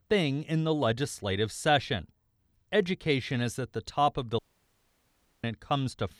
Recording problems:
audio cutting out; at 4.5 s for 1 s

